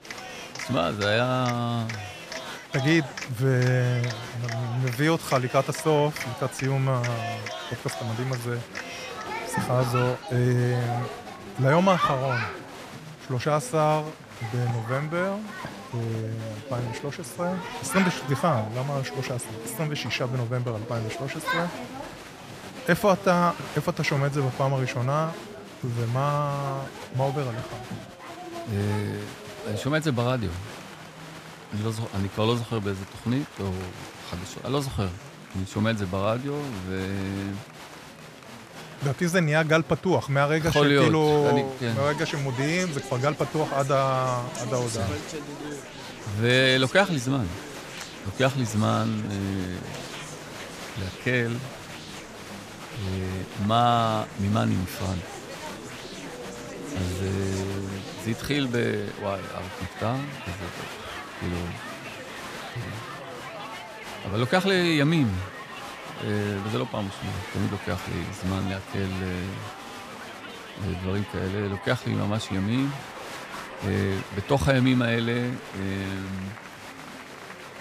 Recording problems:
crowd noise; noticeable; throughout; 10 dB below the speech
chatter from many people; faint; throughout; 20 dB below the speech

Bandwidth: 14.5 kHz